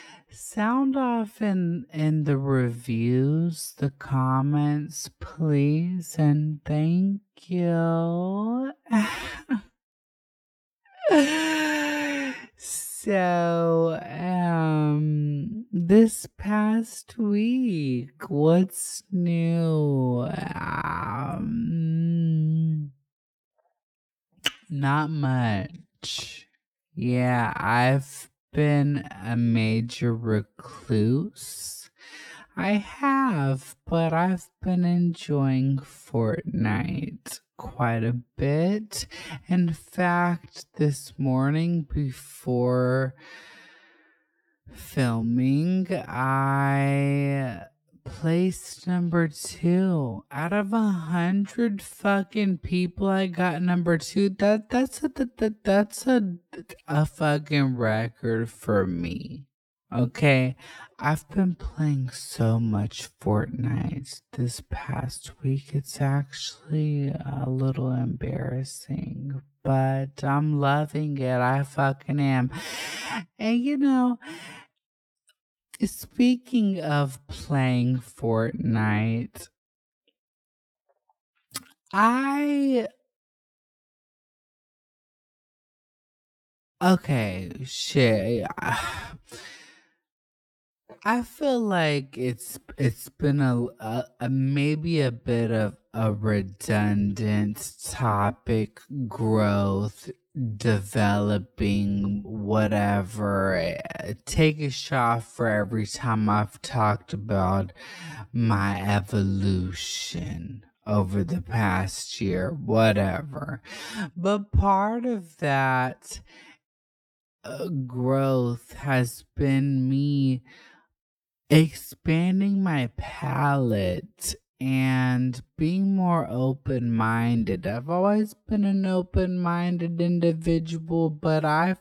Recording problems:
wrong speed, natural pitch; too slow; 0.5 times normal speed

